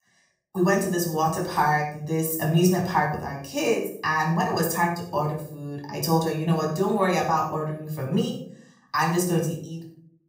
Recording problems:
off-mic speech; far
room echo; noticeable; dies away in 0.5 s

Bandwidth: 15.5 kHz